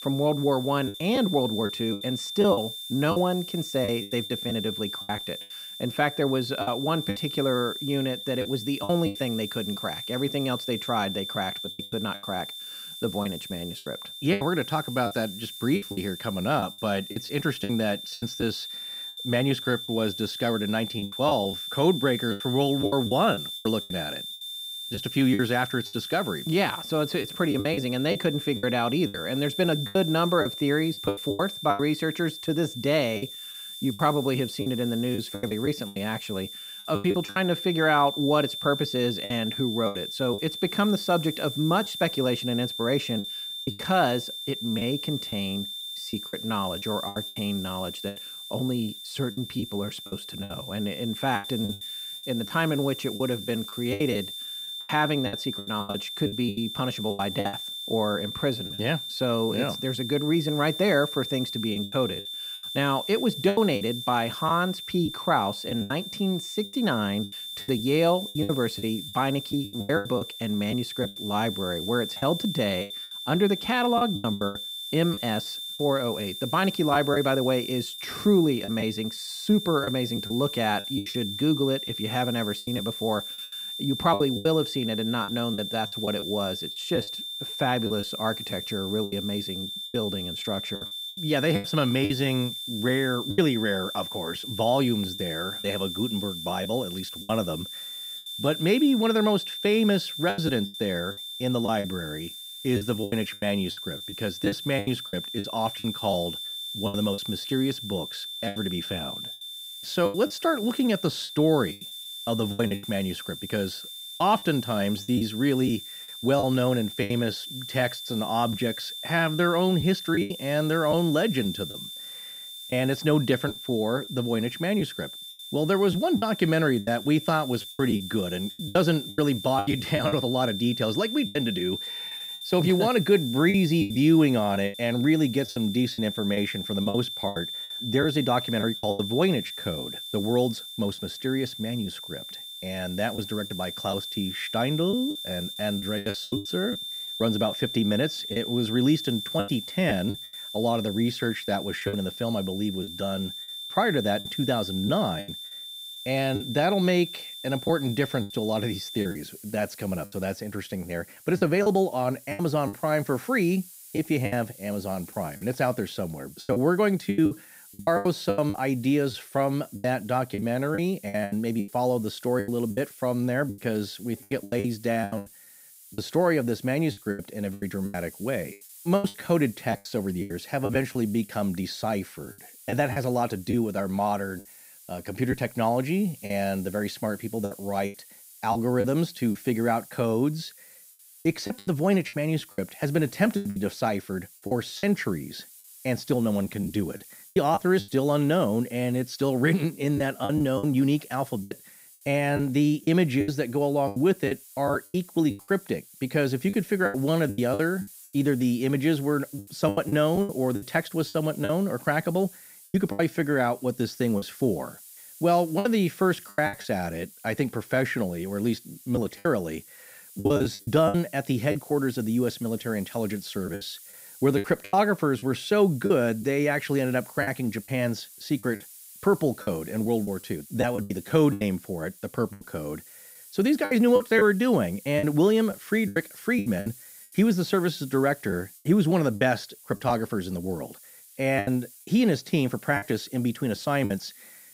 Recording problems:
high-pitched whine; loud; until 2:39; 3.5 kHz, 8 dB below the speech
hiss; noticeable; throughout; 20 dB below the speech
choppy; very; 9% of the speech affected

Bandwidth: 15.5 kHz